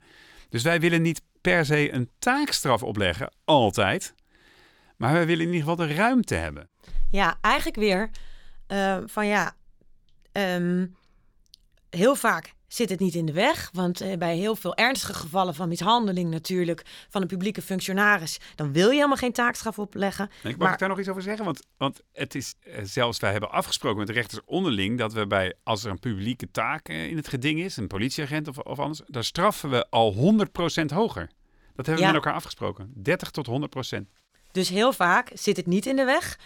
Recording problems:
choppy; occasionally; at 22 s; 2% of the speech affected

